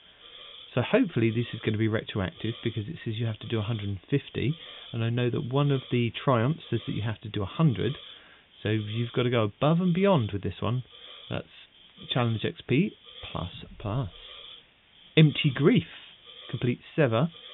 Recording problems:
high frequencies cut off; severe; nothing above 3.5 kHz
hiss; noticeable; throughout; 20 dB below the speech

